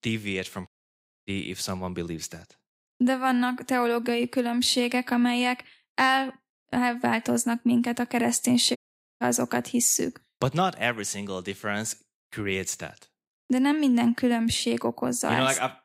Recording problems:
audio cutting out; at 0.5 s for 0.5 s and at 9 s

